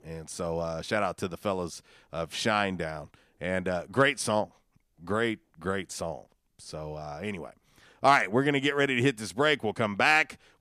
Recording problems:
none

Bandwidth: 14.5 kHz